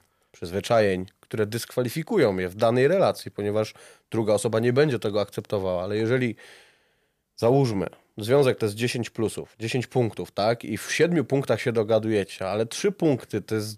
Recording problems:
none

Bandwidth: 15 kHz